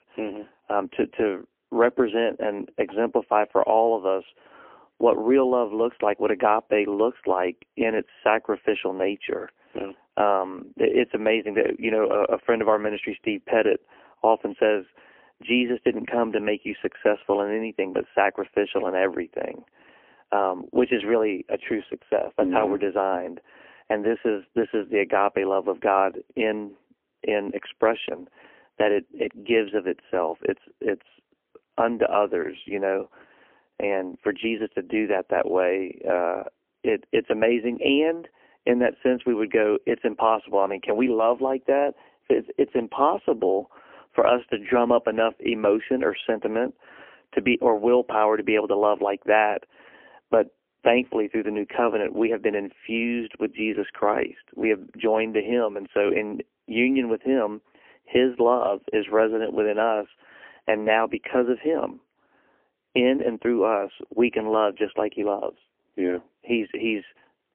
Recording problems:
phone-call audio; poor line; nothing above 3 kHz

